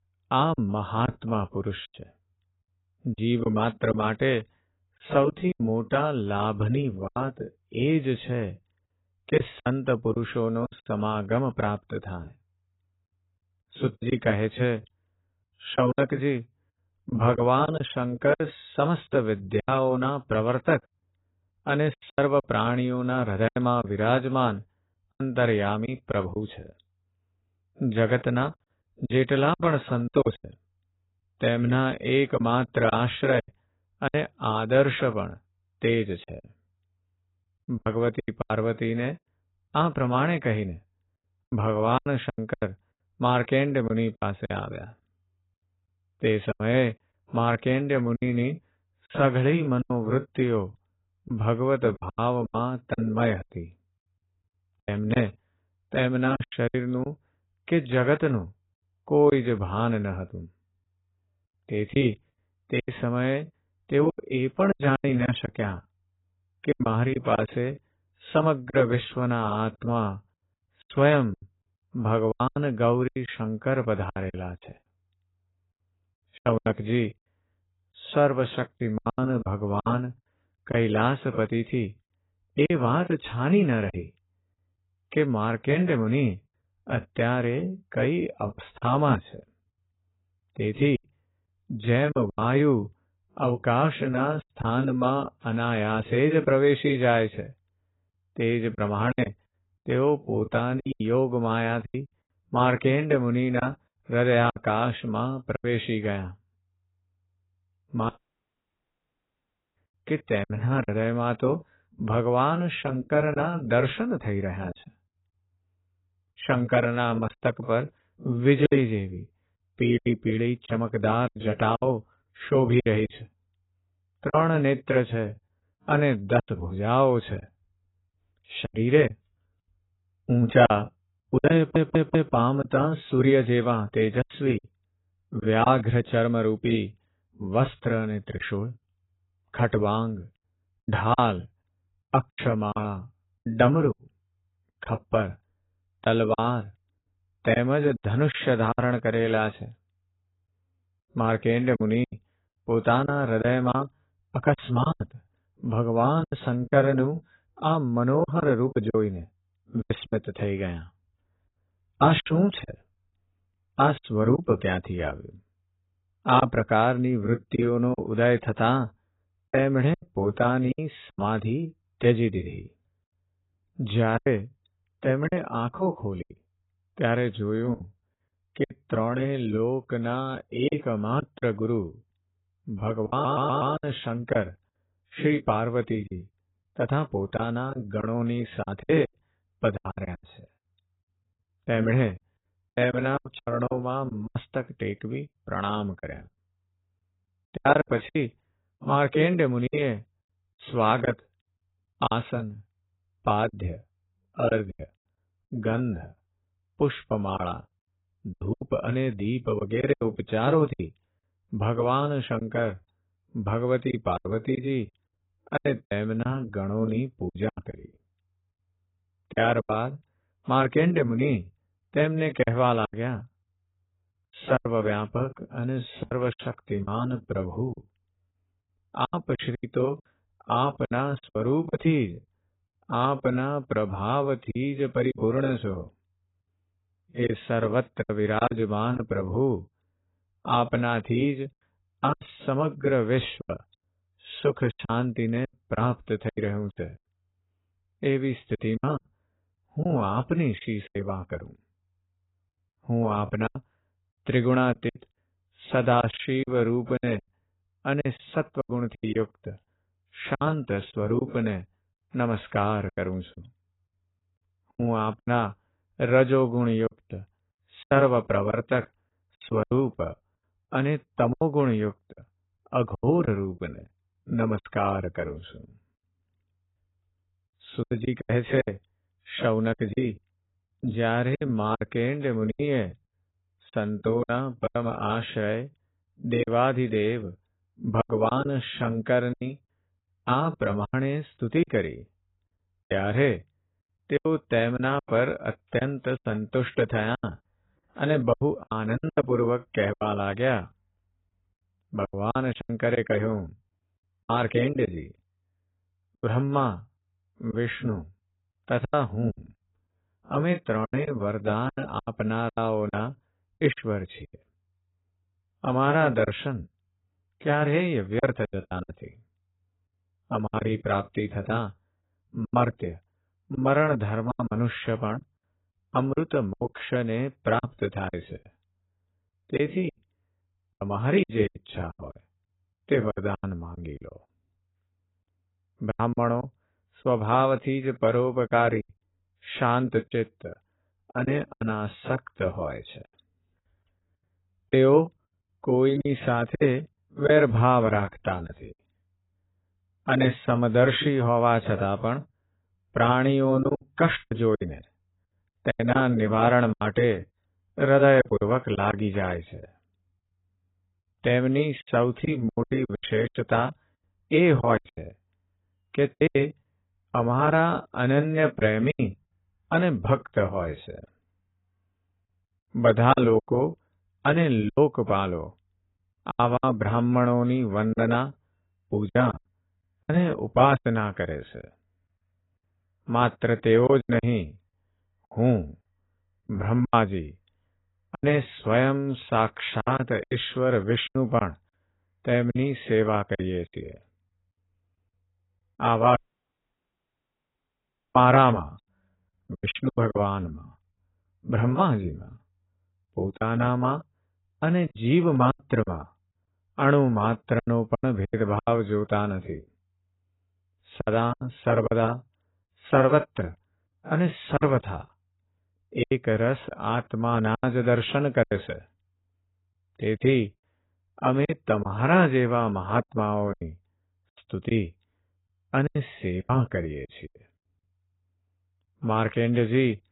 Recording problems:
garbled, watery; badly; nothing above 4 kHz
choppy; very; 10% of the speech affected
audio cutting out; at 1:48 for 1.5 s and at 6:36 for 2 s
audio stuttering; at 2:12 and at 3:03

